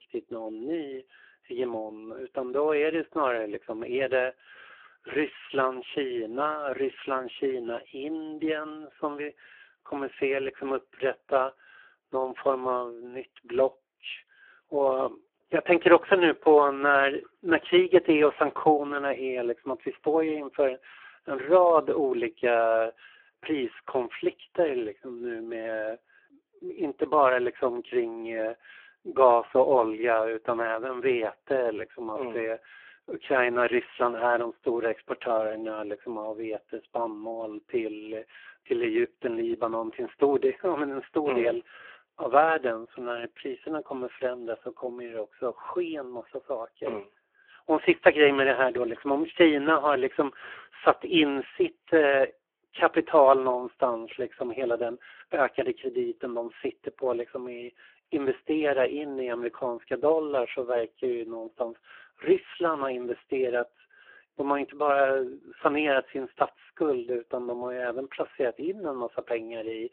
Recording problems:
phone-call audio; poor line

